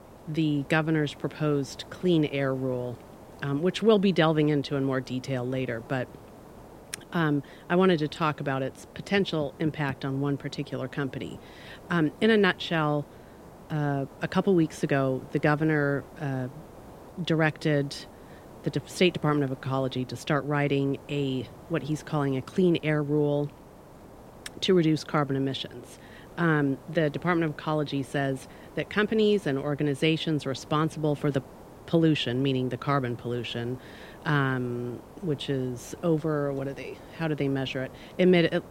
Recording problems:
hiss; faint; throughout; 20 dB below the speech

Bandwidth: 16 kHz